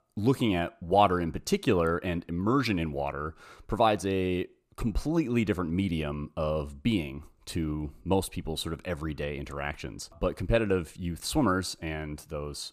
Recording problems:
none

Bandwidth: 14.5 kHz